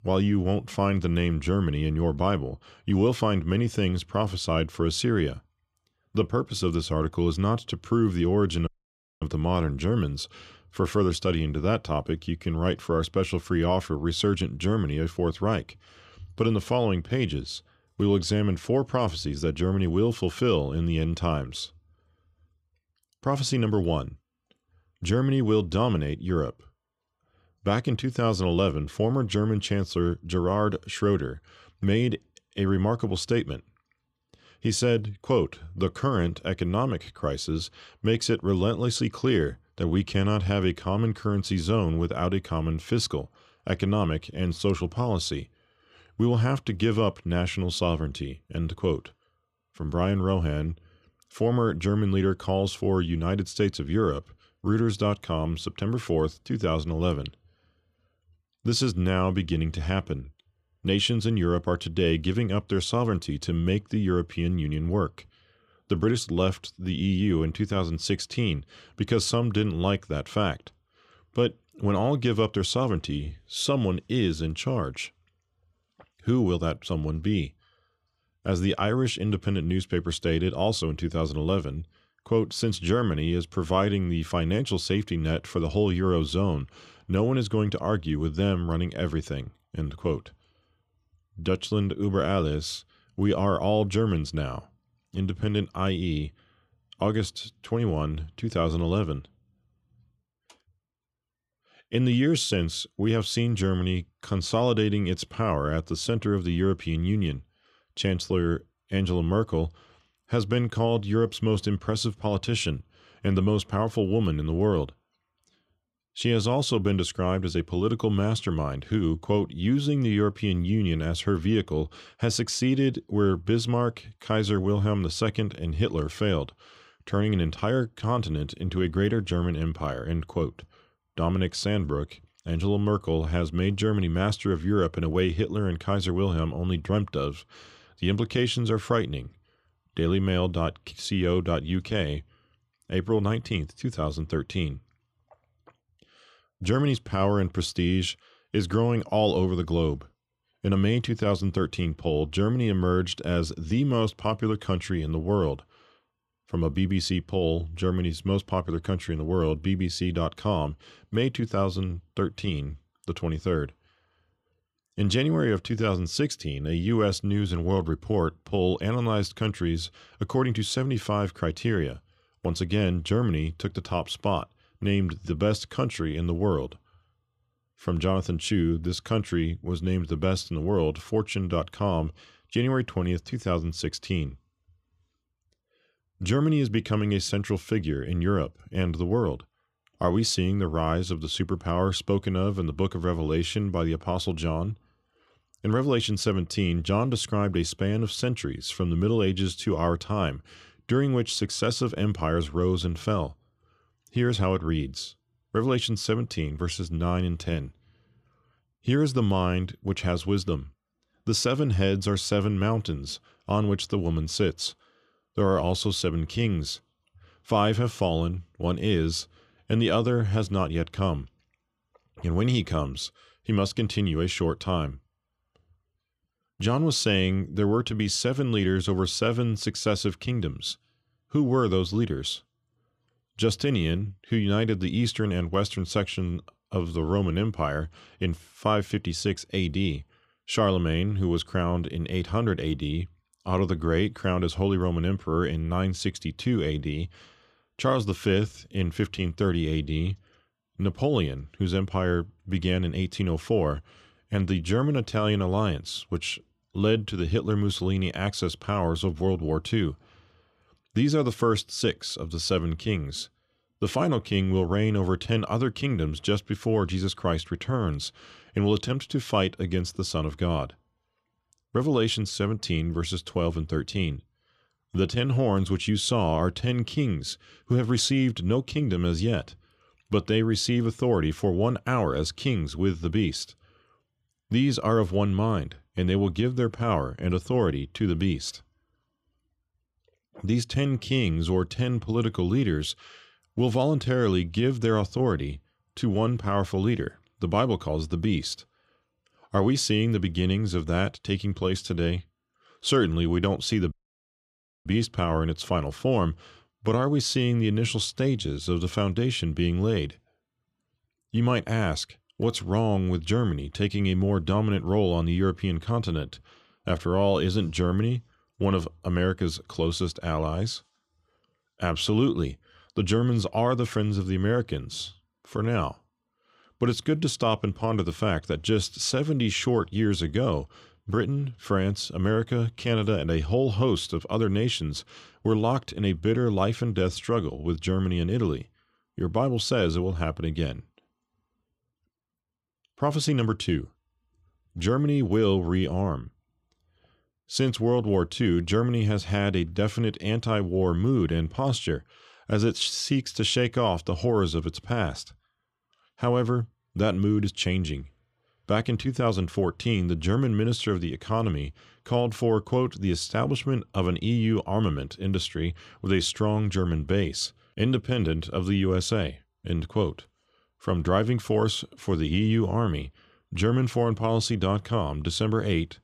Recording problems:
audio cutting out; at 8.5 s for 0.5 s and at 5:04 for 1 s

